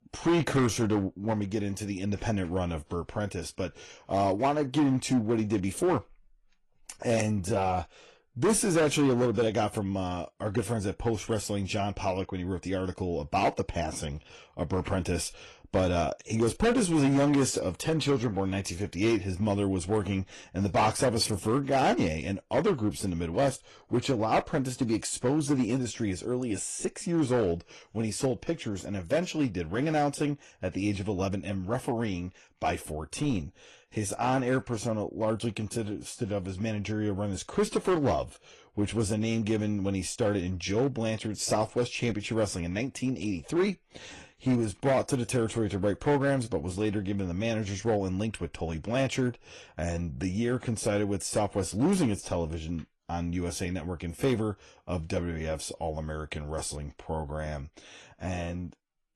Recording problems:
distortion; slight; 4% of the sound clipped
garbled, watery; slightly

